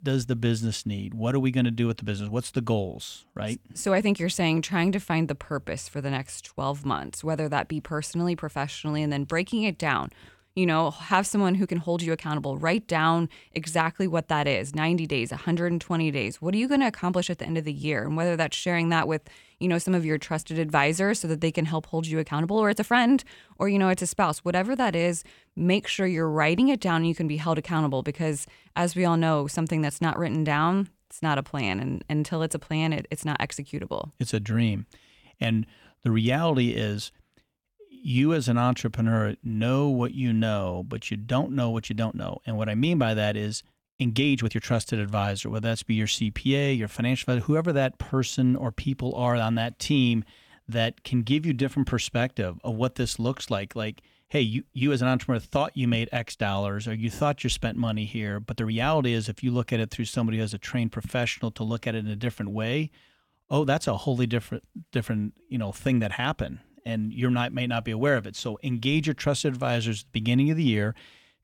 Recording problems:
uneven, jittery; strongly; from 3.5 to 59 s

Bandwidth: 18 kHz